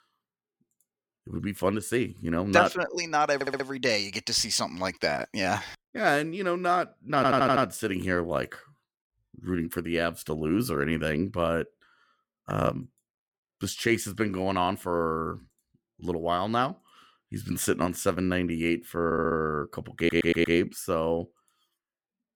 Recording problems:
audio stuttering; 4 times, first at 3.5 s

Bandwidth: 17.5 kHz